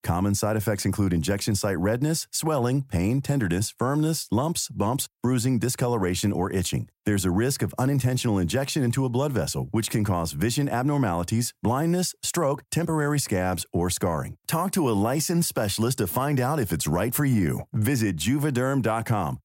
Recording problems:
none

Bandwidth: 16 kHz